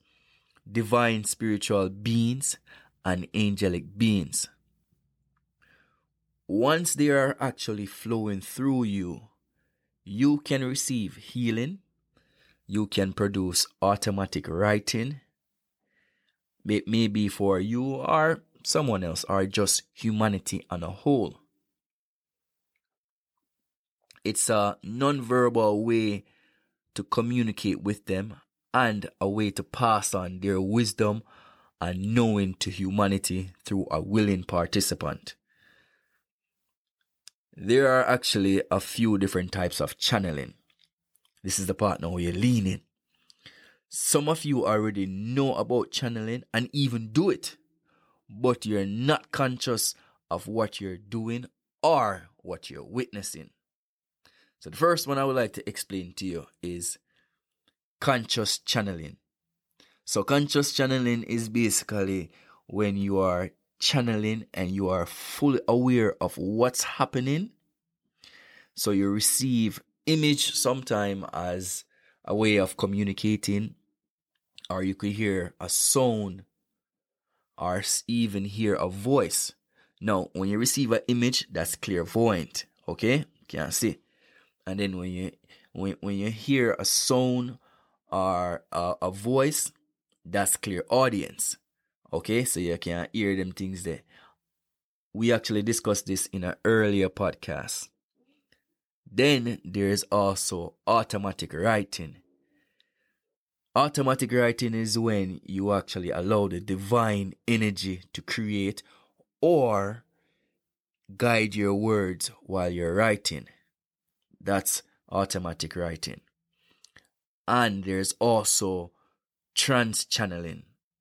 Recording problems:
none

